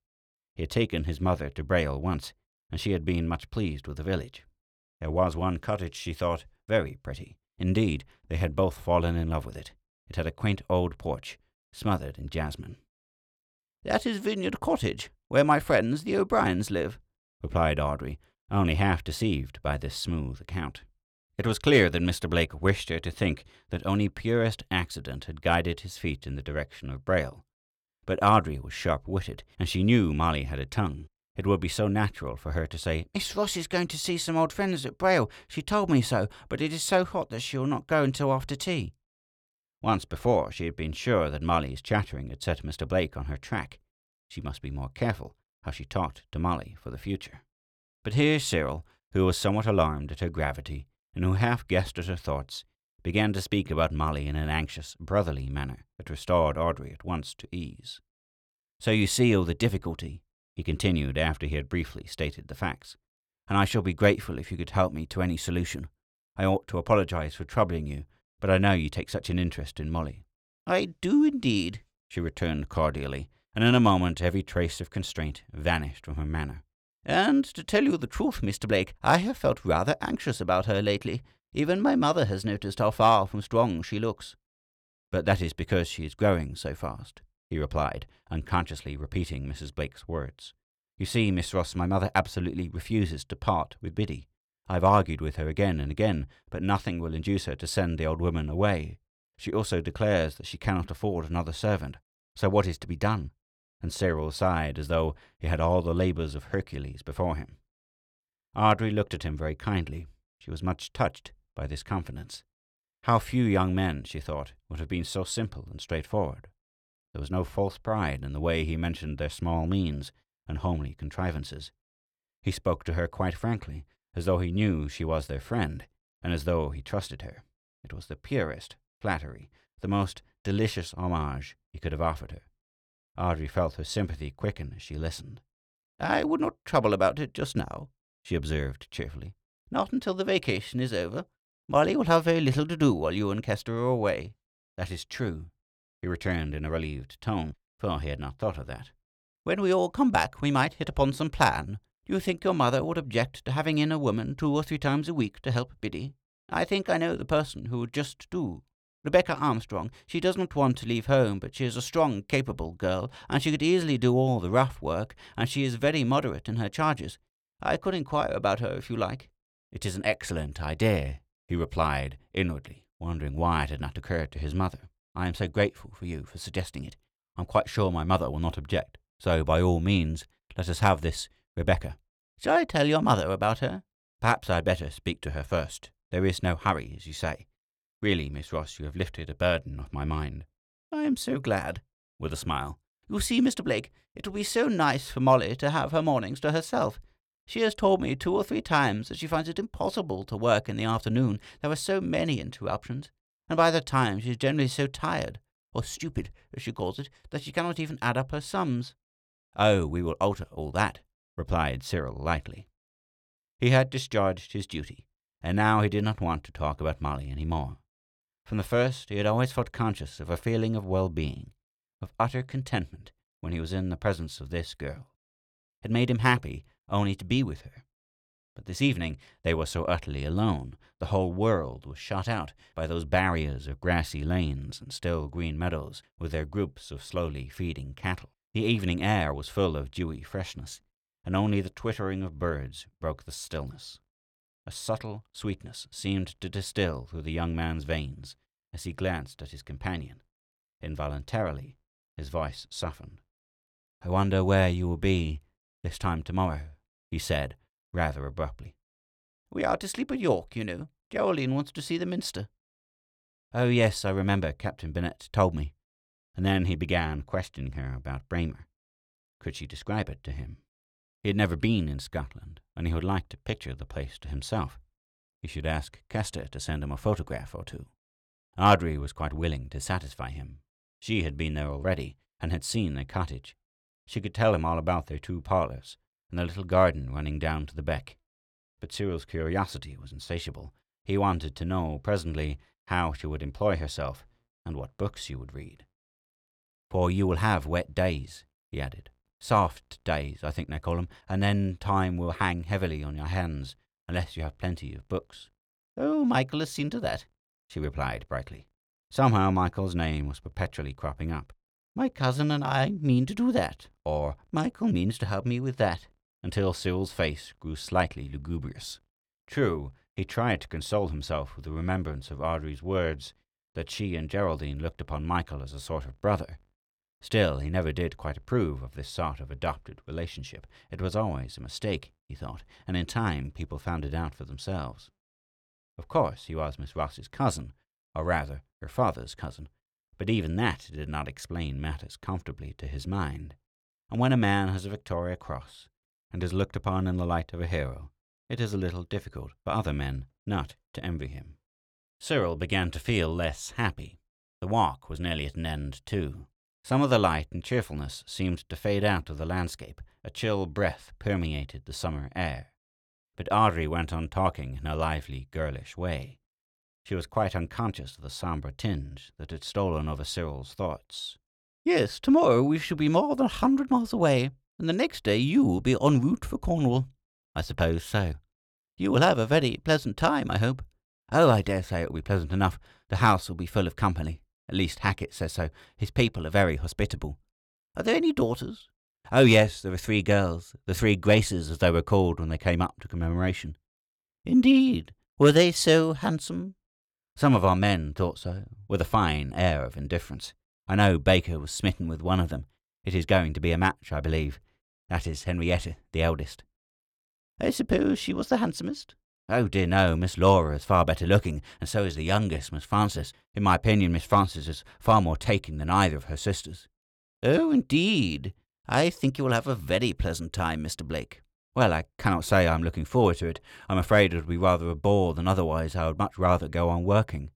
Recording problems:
none

